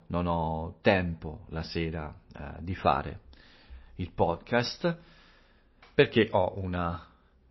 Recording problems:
garbled, watery; slightly; nothing above 5.5 kHz

